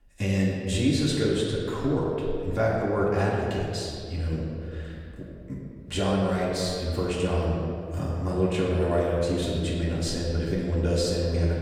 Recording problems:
off-mic speech; far
room echo; noticeable; dies away in 2.1 s

